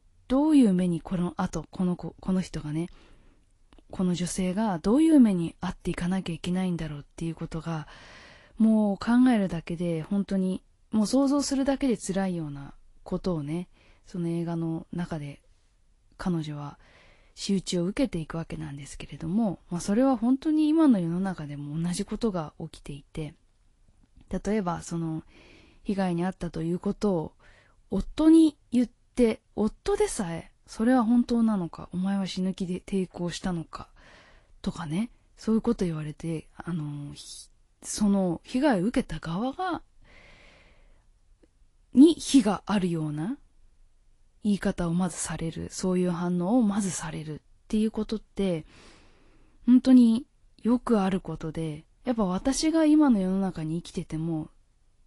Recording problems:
garbled, watery; slightly; nothing above 11 kHz

